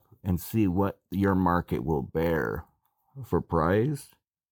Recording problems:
none

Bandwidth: 17 kHz